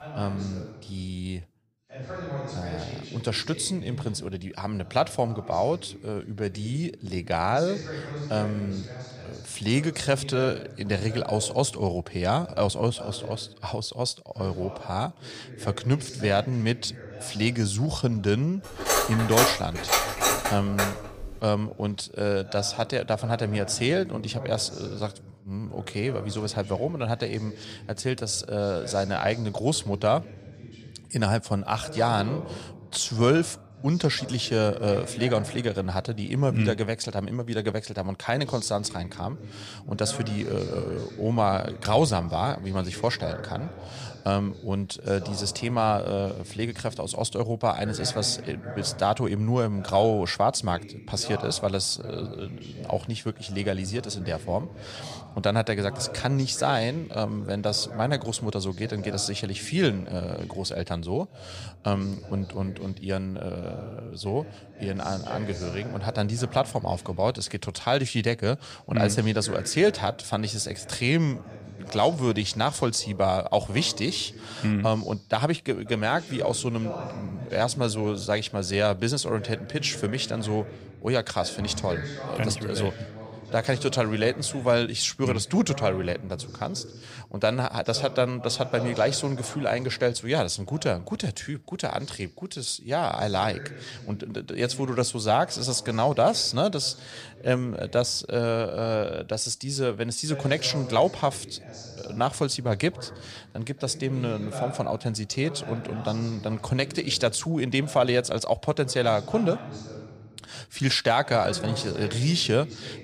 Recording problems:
voice in the background; noticeable; throughout; 15 dB below the speech
clattering dishes; loud; from 19 to 21 s; peak 5 dB above the speech

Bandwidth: 15 kHz